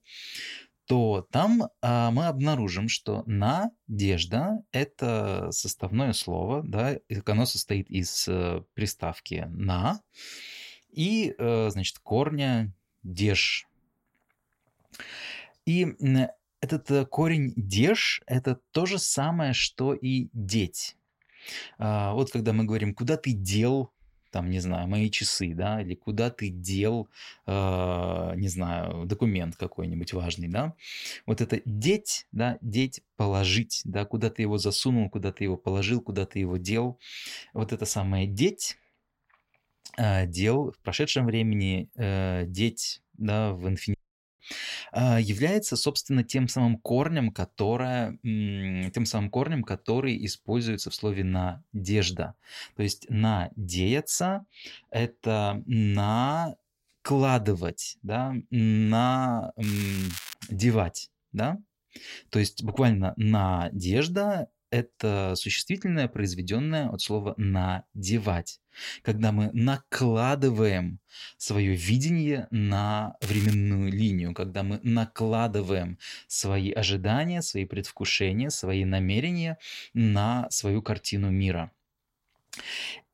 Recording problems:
crackling; noticeable; at 1:00 and at 1:13; 10 dB below the speech
audio cutting out; at 44 s

